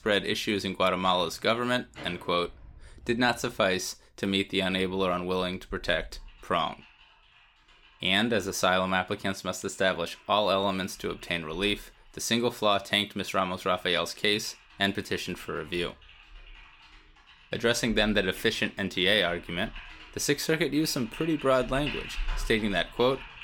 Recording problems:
household noises; noticeable; throughout; 20 dB below the speech

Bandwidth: 17.5 kHz